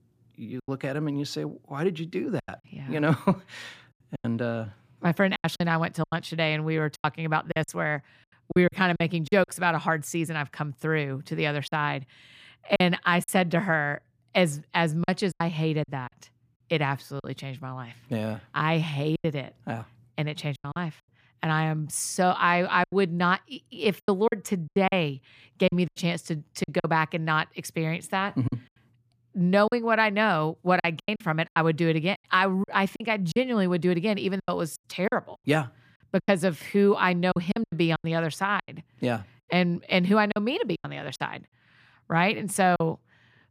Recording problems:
choppy; very; 9% of the speech affected

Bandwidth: 14.5 kHz